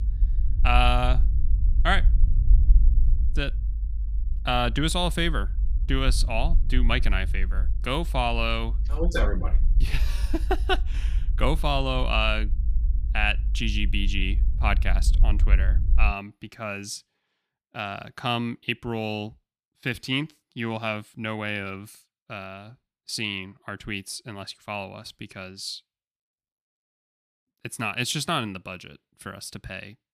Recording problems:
low rumble; noticeable; until 16 s; 20 dB below the speech

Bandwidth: 14.5 kHz